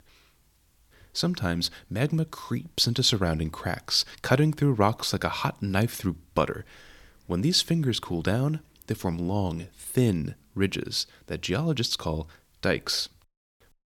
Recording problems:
none

